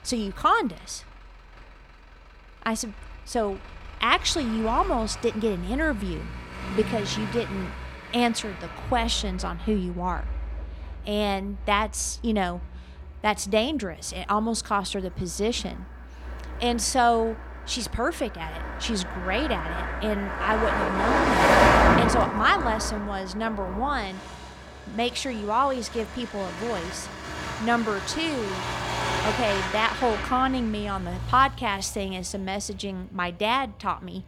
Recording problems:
traffic noise; loud; throughout; 2 dB below the speech

